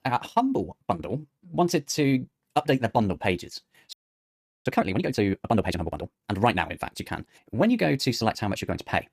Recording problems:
wrong speed, natural pitch; too fast; 1.6 times normal speed
audio freezing; at 4 s for 0.5 s

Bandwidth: 14.5 kHz